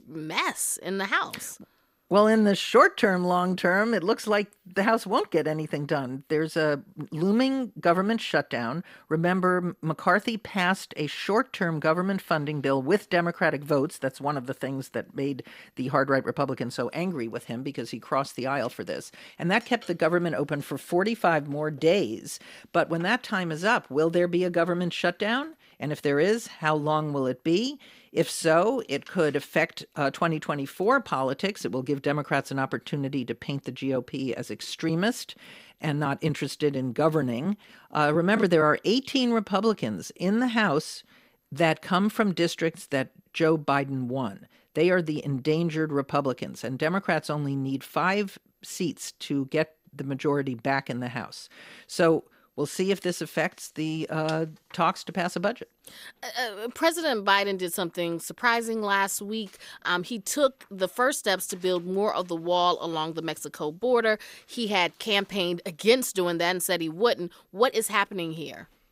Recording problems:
none

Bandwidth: 15.5 kHz